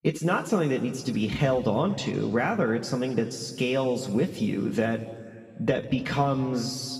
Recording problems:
room echo; slight; dies away in 1.9 s
off-mic speech; somewhat distant

